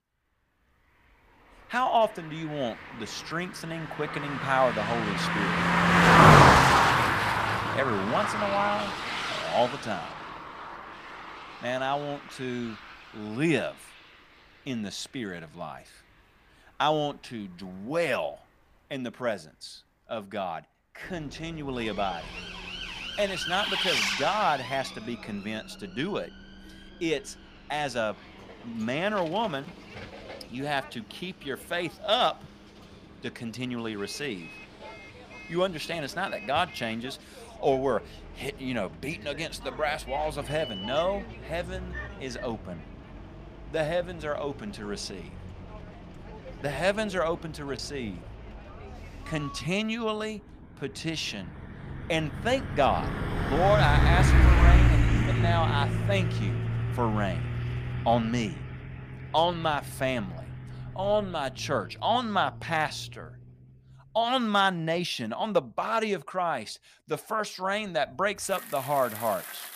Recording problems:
traffic noise; very loud; throughout; 5 dB above the speech

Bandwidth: 15 kHz